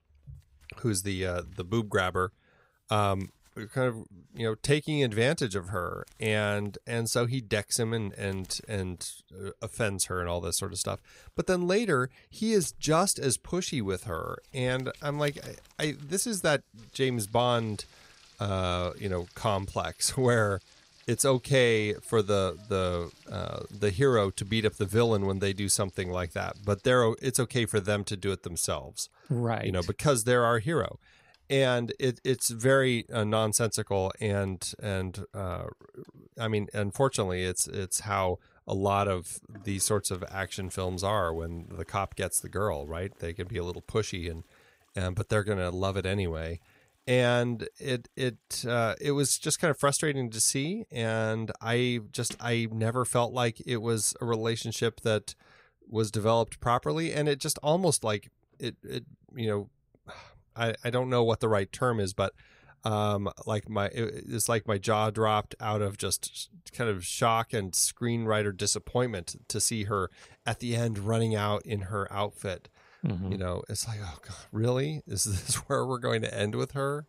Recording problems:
household noises; faint; throughout; 30 dB below the speech

